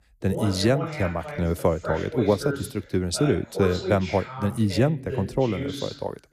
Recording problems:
voice in the background; loud; throughout; 8 dB below the speech

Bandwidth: 14.5 kHz